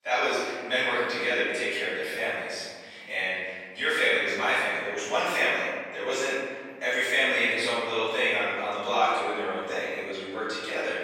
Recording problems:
room echo; strong; dies away in 1.9 s
off-mic speech; far
thin; very; fading below 550 Hz

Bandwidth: 16 kHz